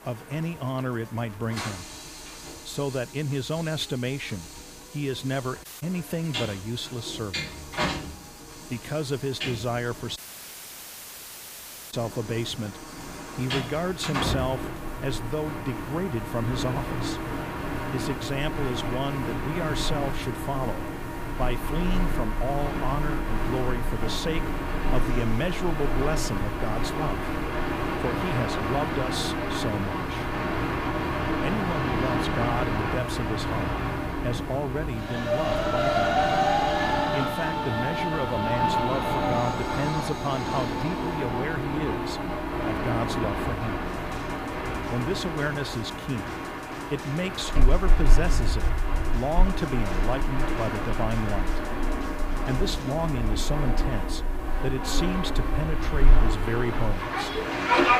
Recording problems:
train or aircraft noise; very loud; throughout; 2 dB above the speech
background music; noticeable; throughout; 15 dB below the speech
hiss; faint; throughout; 20 dB below the speech
audio cutting out; at 5.5 s and at 10 s for 2 s

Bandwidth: 15 kHz